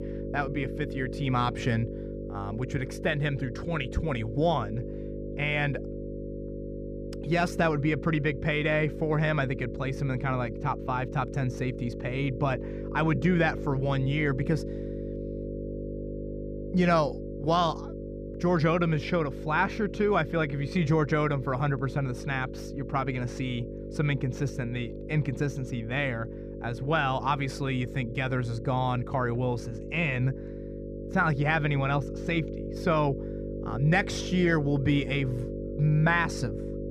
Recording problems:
muffled; slightly; fading above 2.5 kHz
electrical hum; noticeable; throughout; 50 Hz, 10 dB below the speech

